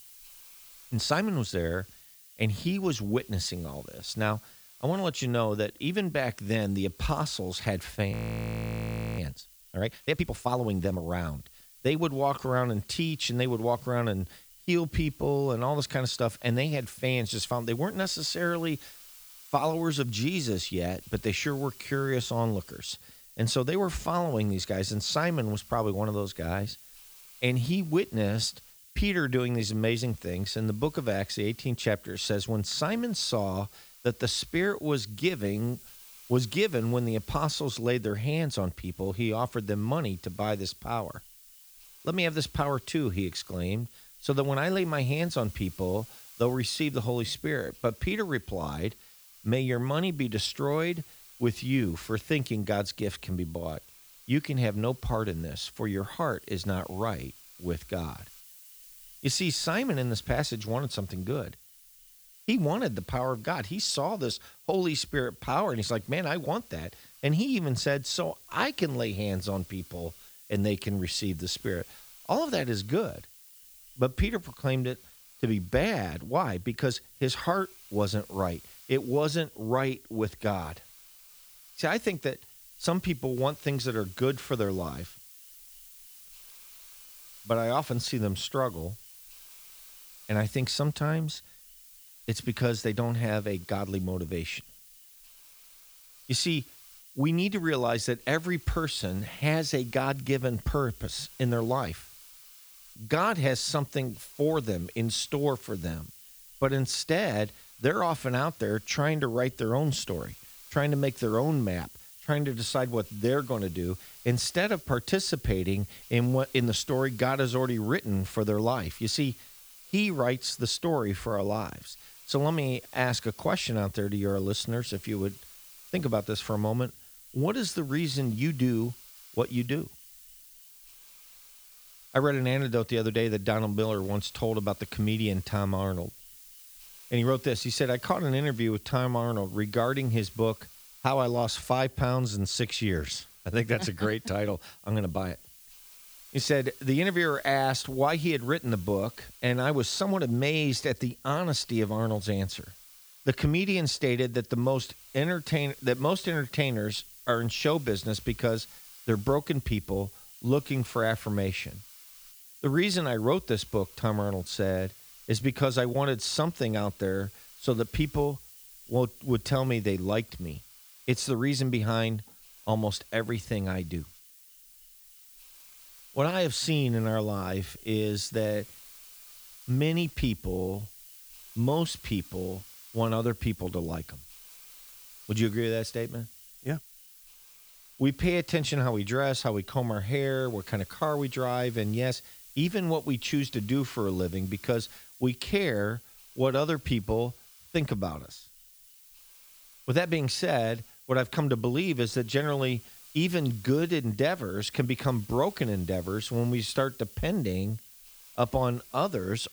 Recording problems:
hiss; noticeable; throughout; 20 dB below the speech
audio freezing; at 8 s for 1 s

